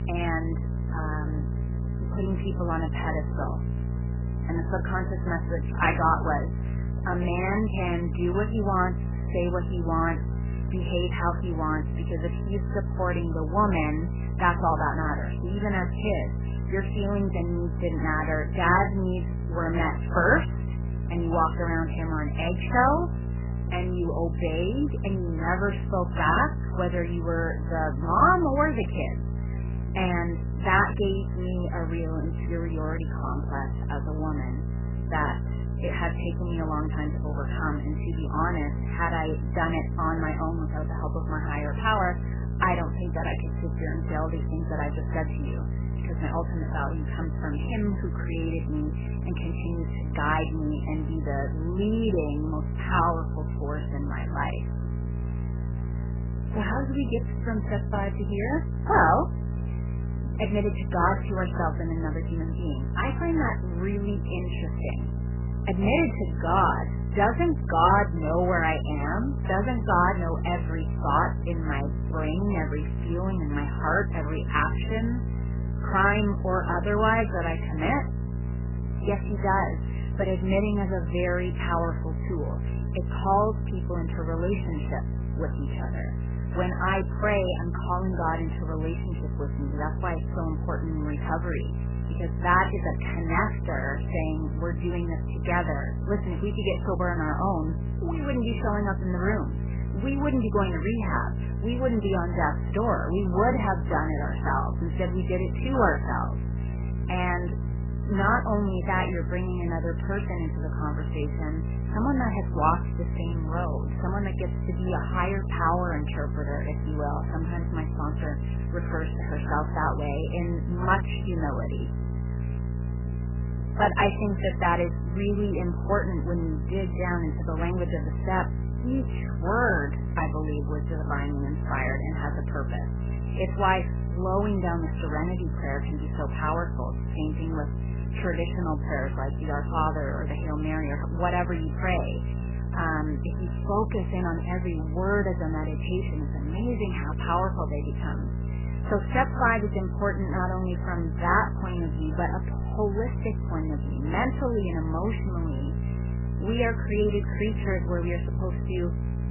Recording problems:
garbled, watery; badly; nothing above 3 kHz
electrical hum; noticeable; throughout; 60 Hz, 15 dB below the speech

